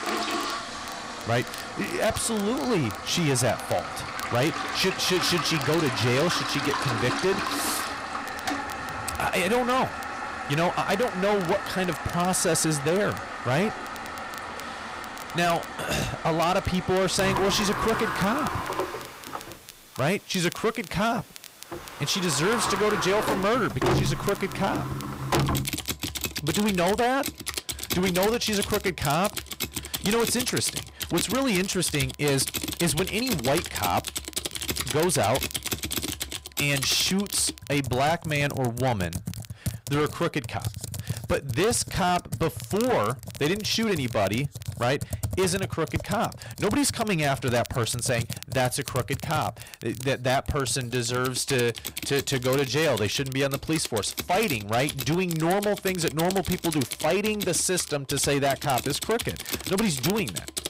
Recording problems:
distortion; heavy; 13% of the sound clipped
household noises; loud; throughout; 6 dB below the speech
crackle, like an old record; noticeable; 20 dB below the speech

